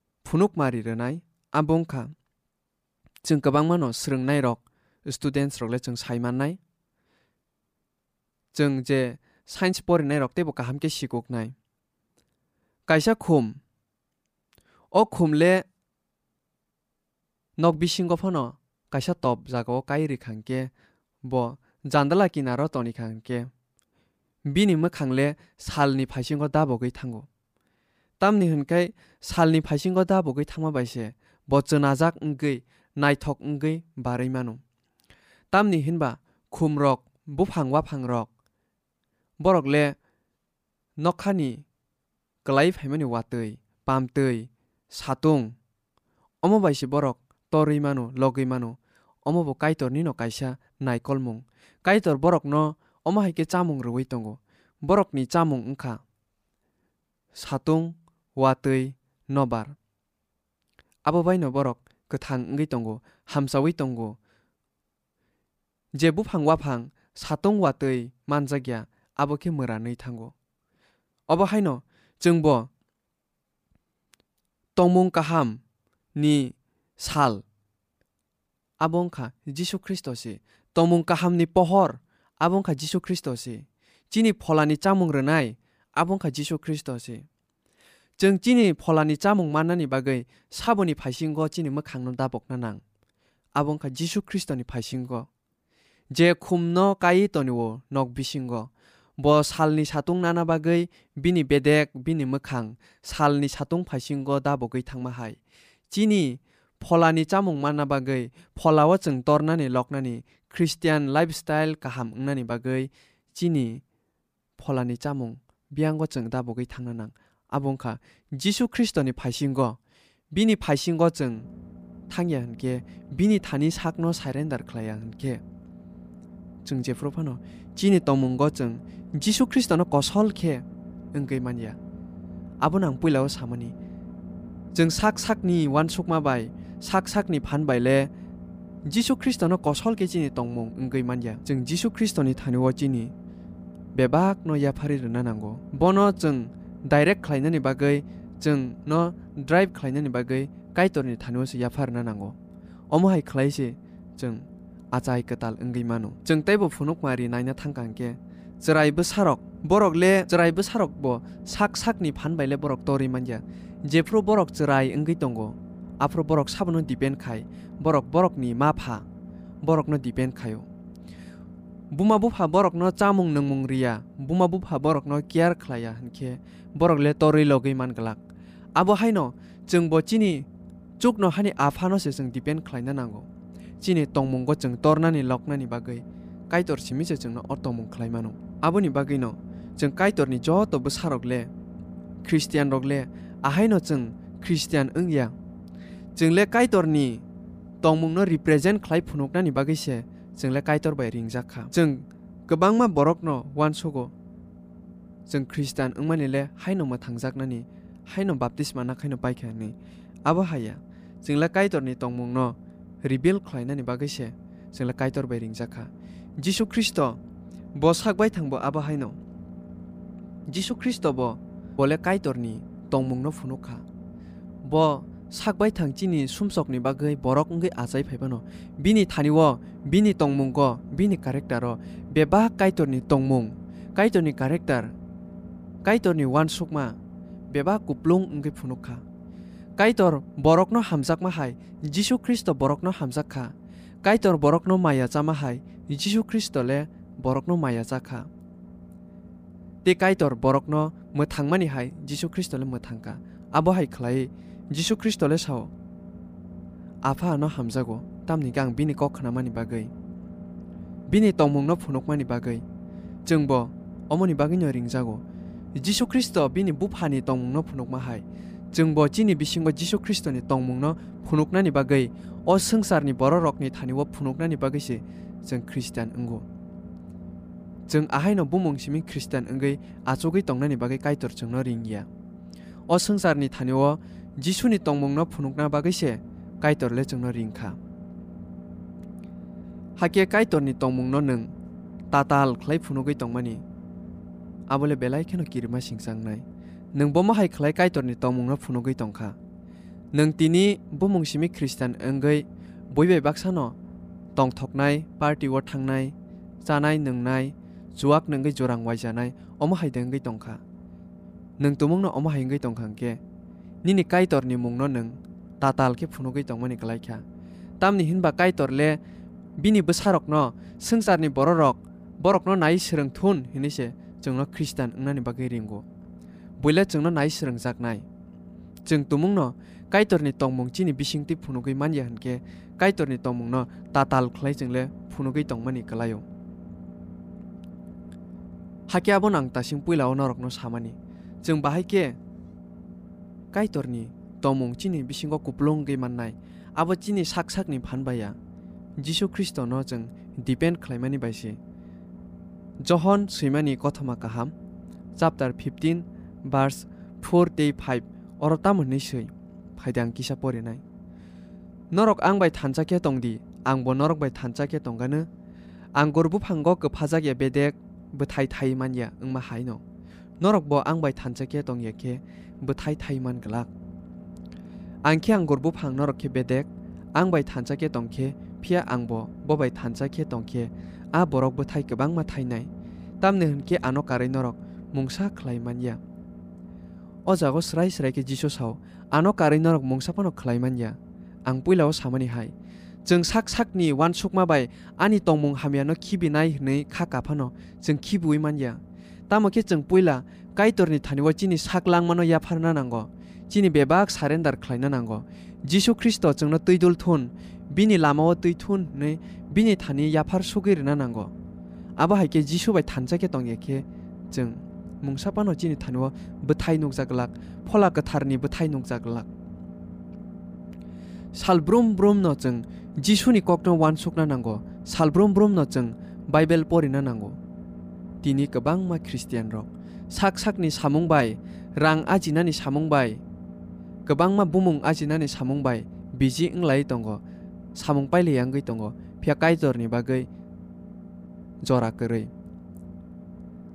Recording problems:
low rumble; faint; from 2:01 on; 25 dB below the speech

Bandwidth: 15 kHz